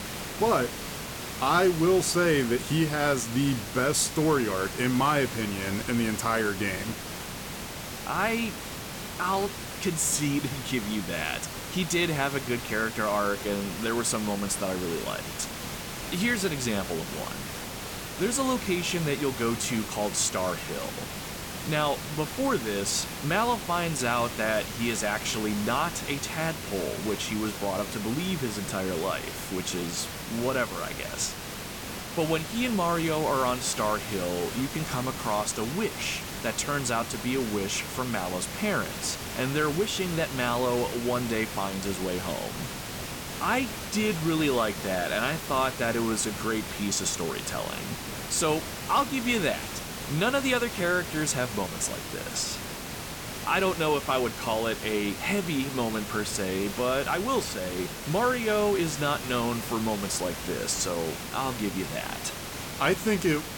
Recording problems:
hiss; loud; throughout; 7 dB below the speech

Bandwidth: 17.5 kHz